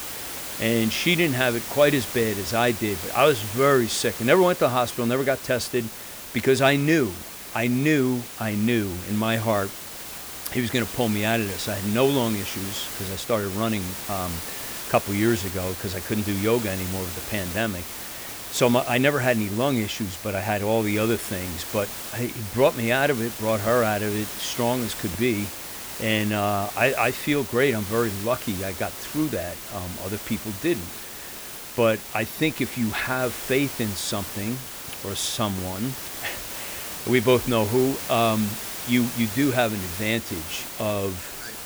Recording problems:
hiss; loud; throughout; 8 dB below the speech

